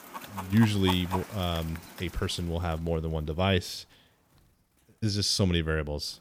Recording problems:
animal sounds; noticeable; throughout; 10 dB below the speech

